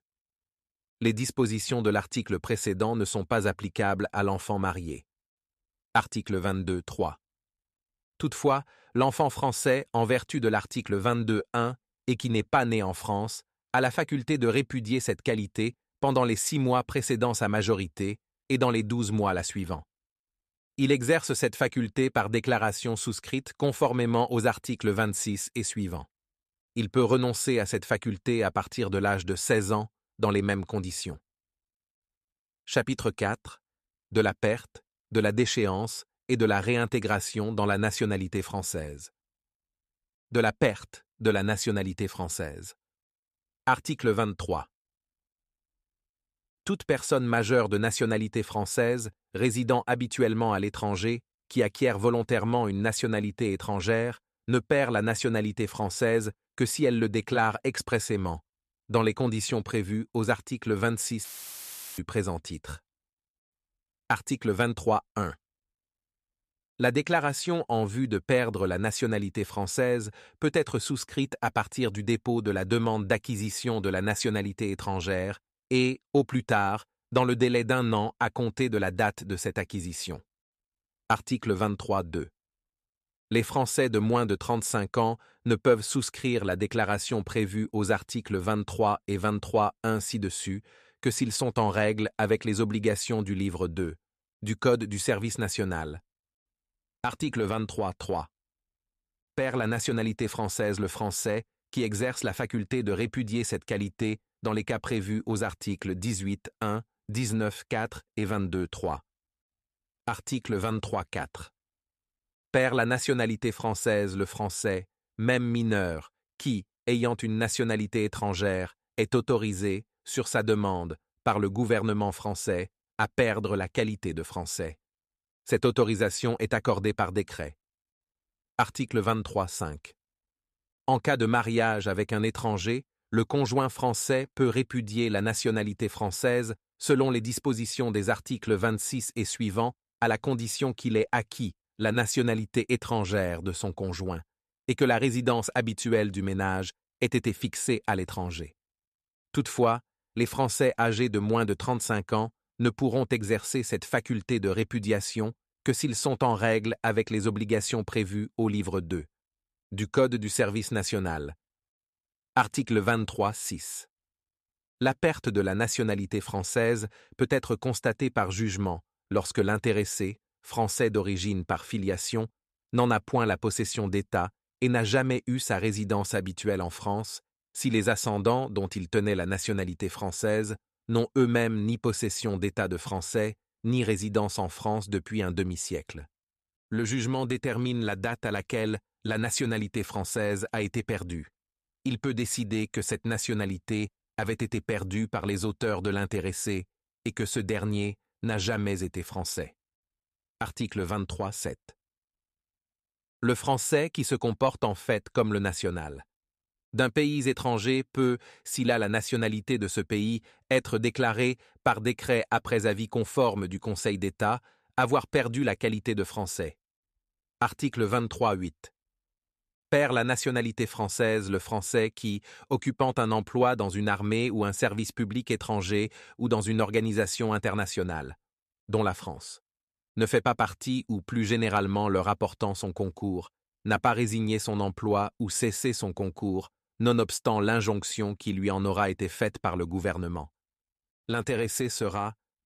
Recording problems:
audio cutting out; filled with static; at 1:01 for 0.5 s

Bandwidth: 14 kHz